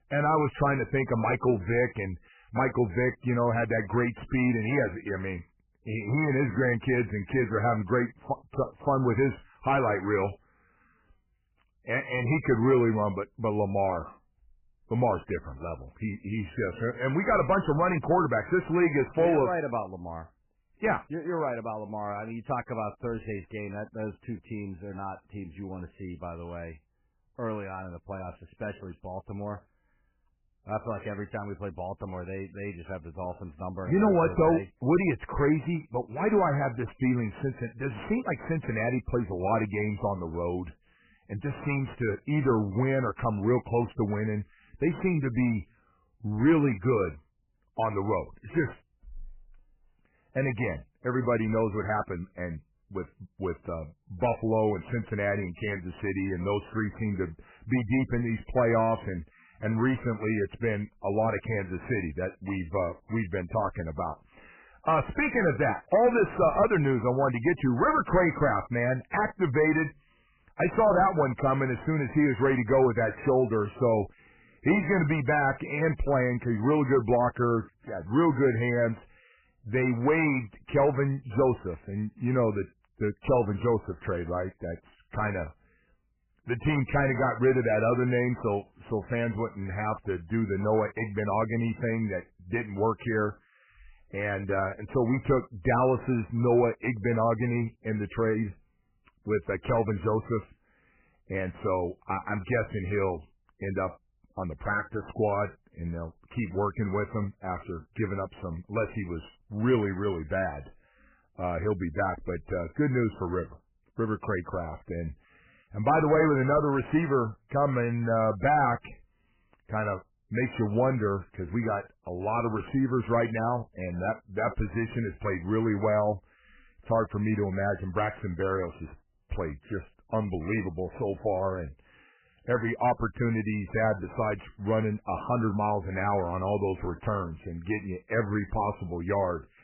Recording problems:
garbled, watery; badly; nothing above 2.5 kHz
distortion; slight; 10 dB below the speech

